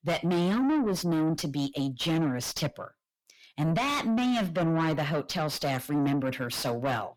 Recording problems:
distortion; heavy; 7 dB below the speech

